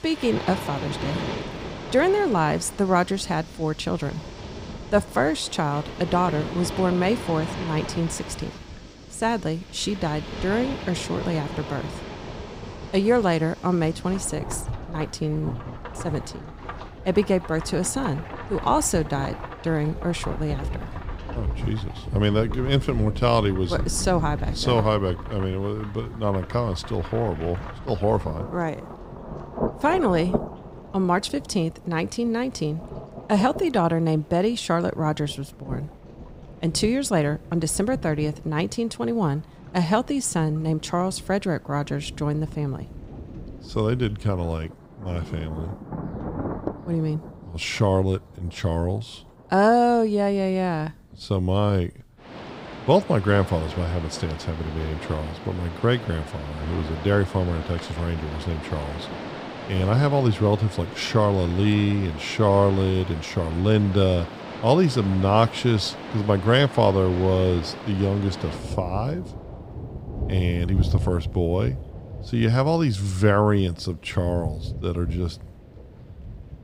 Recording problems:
rain or running water; noticeable; throughout; 10 dB below the speech

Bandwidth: 15.5 kHz